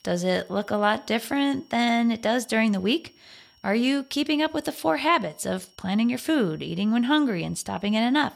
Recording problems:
high-pitched whine; faint; throughout; 5.5 kHz, 35 dB below the speech

